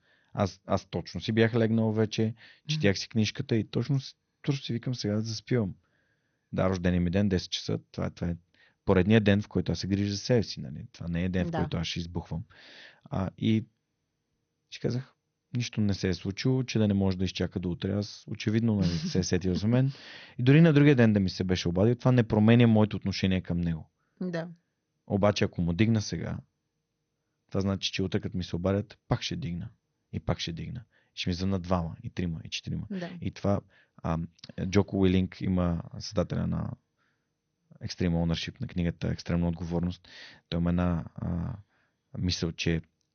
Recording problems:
garbled, watery; slightly; nothing above 6.5 kHz

